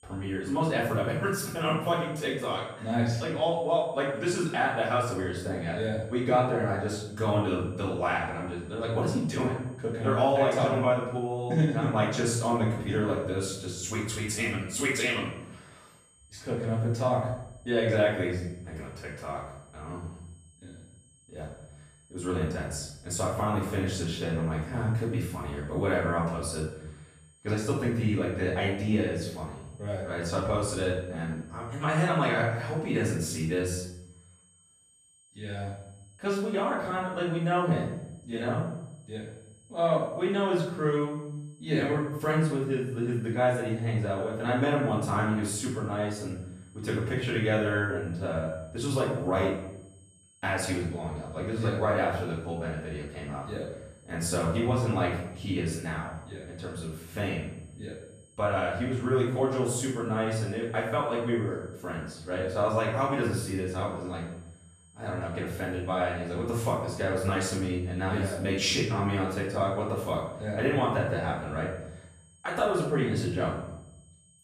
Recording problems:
off-mic speech; far
room echo; noticeable; dies away in 0.8 s
high-pitched whine; faint; throughout; 8 kHz, 30 dB below the speech

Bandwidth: 14.5 kHz